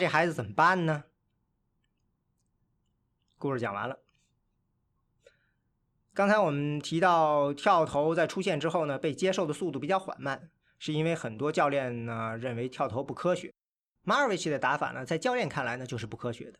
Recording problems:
abrupt cut into speech; at the start

